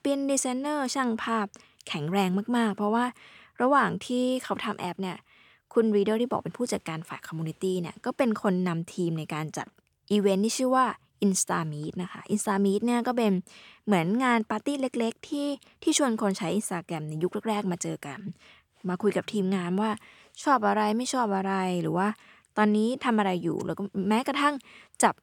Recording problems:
none

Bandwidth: 18 kHz